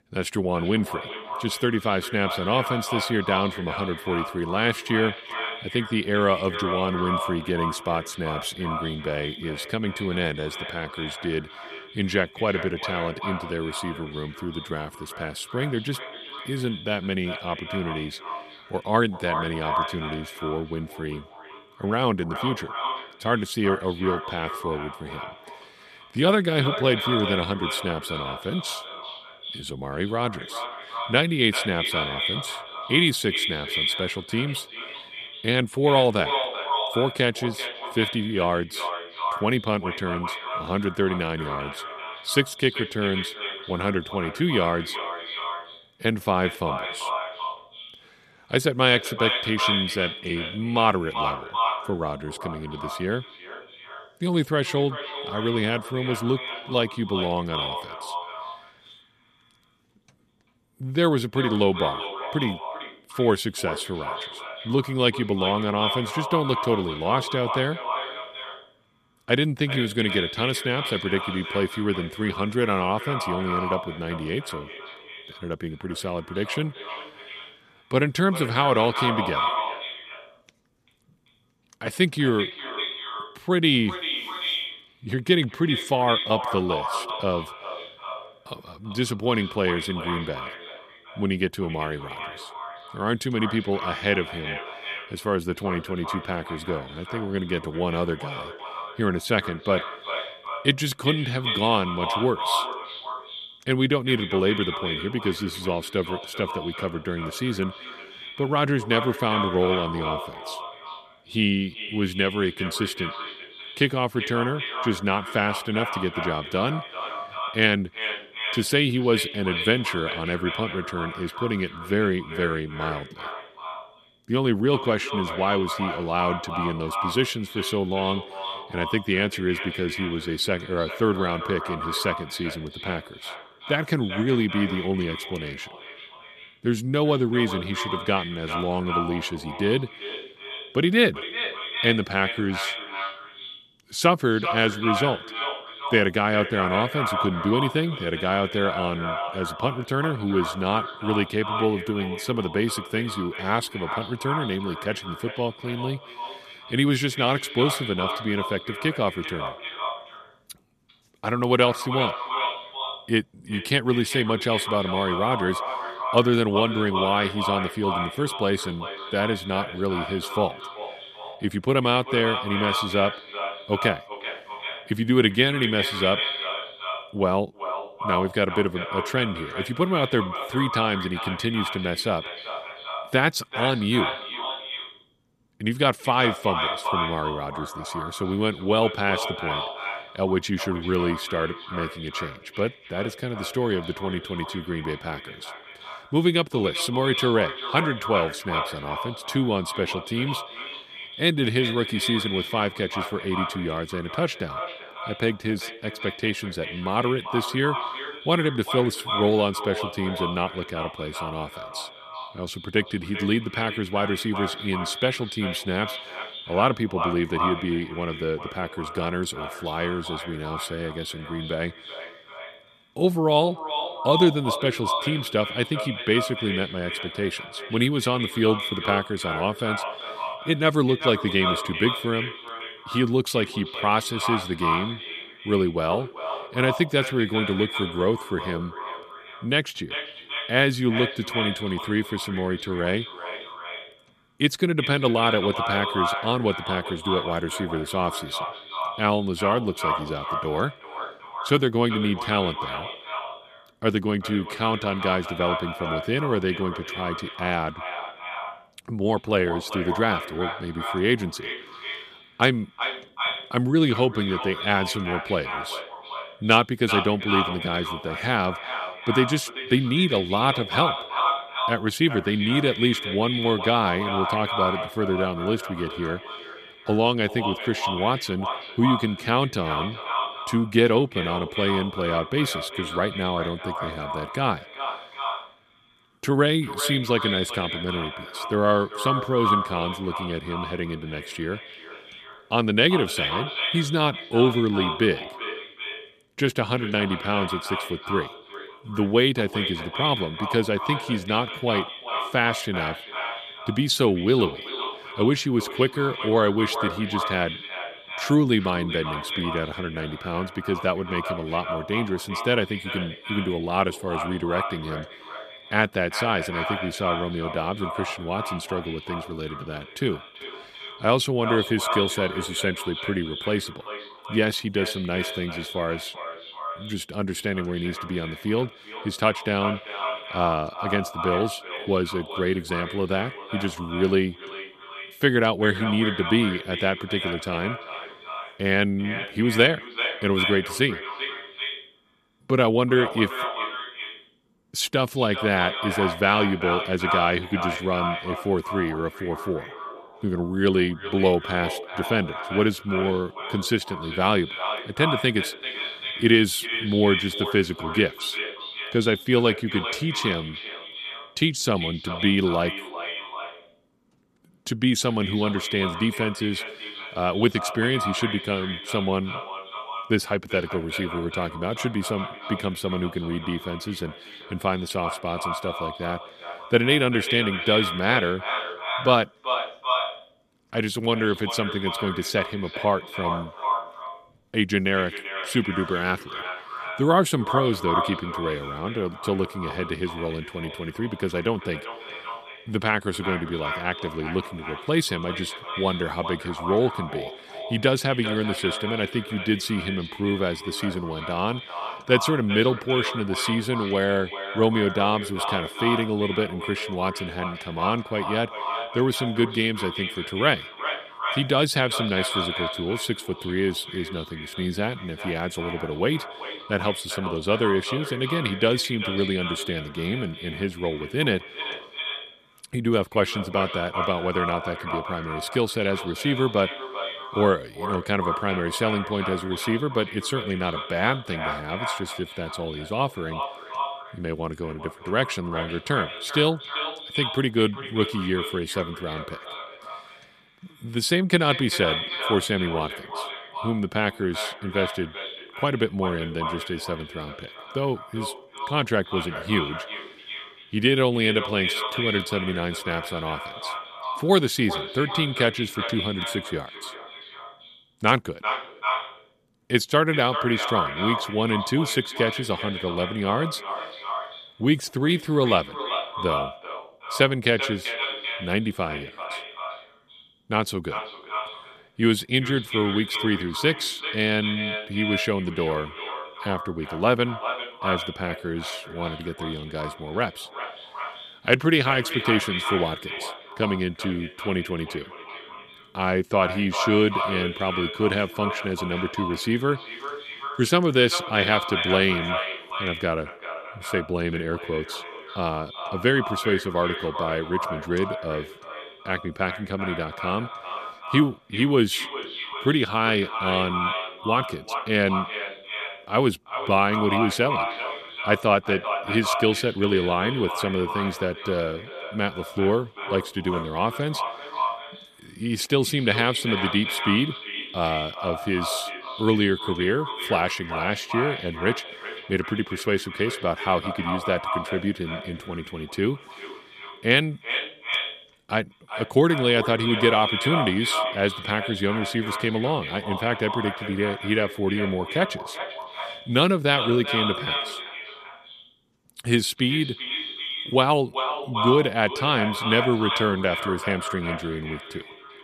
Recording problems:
echo of what is said; strong; throughout; 390 ms later, 6 dB below the speech

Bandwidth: 14.5 kHz